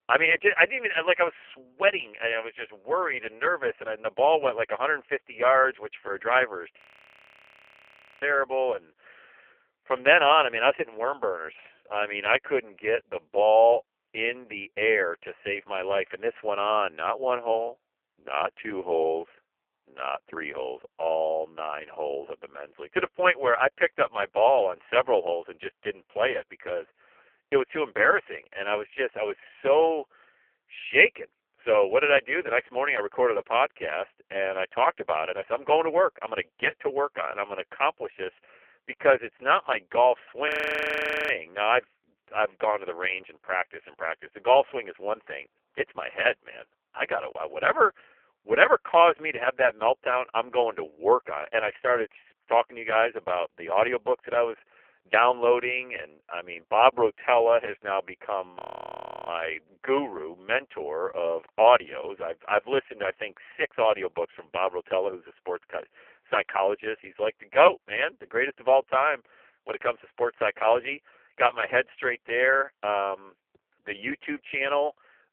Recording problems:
phone-call audio; poor line; nothing above 3 kHz
audio freezing; at 7 s for 1.5 s, at 40 s for 1 s and at 59 s for 0.5 s

